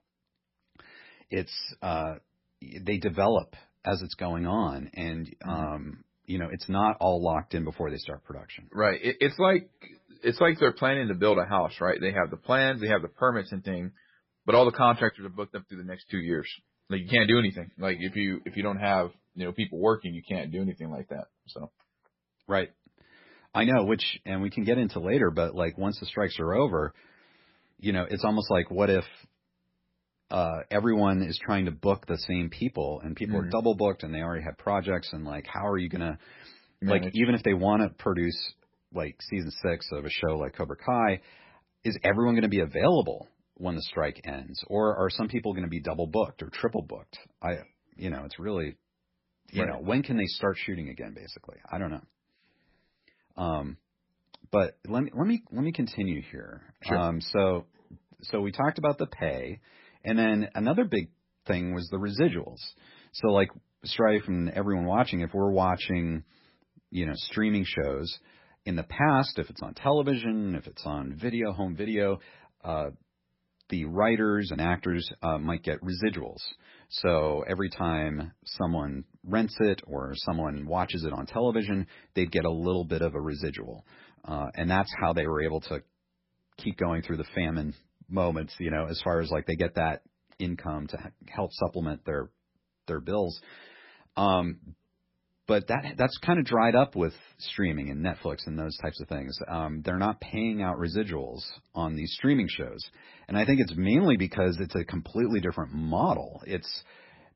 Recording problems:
garbled, watery; badly; nothing above 5.5 kHz

